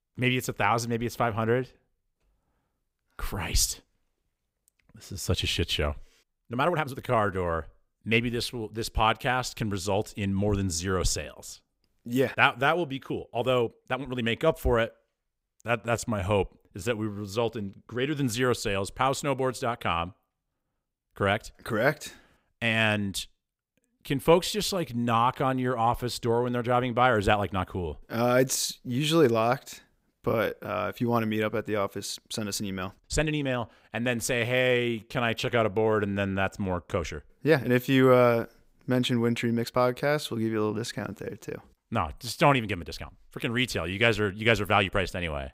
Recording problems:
uneven, jittery; strongly; from 6.5 to 43 s

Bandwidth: 15.5 kHz